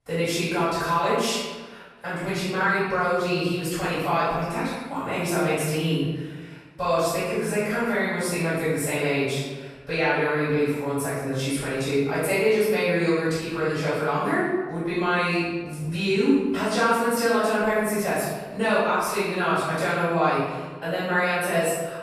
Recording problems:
room echo; strong; dies away in 1.2 s
off-mic speech; far

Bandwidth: 14 kHz